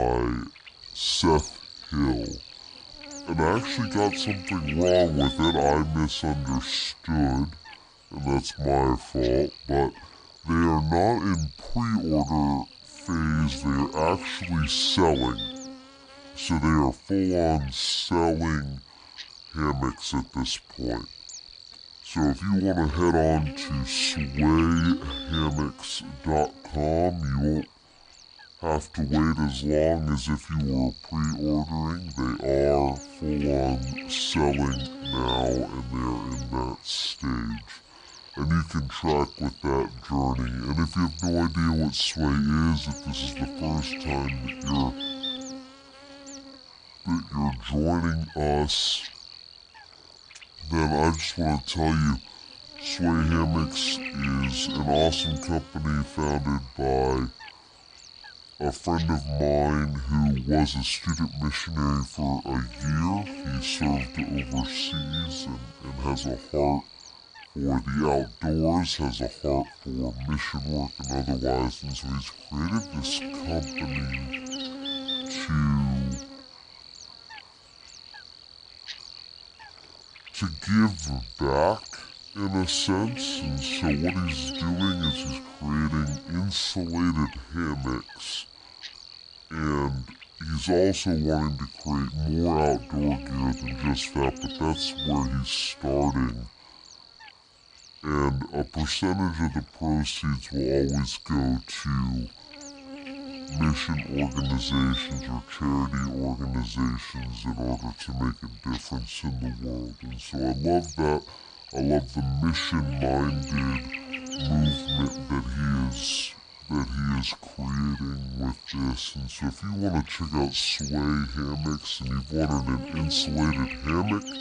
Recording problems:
wrong speed and pitch; too slow and too low; 0.6 times normal speed
electrical hum; loud; throughout; 50 Hz, 10 dB below the speech
abrupt cut into speech; at the start

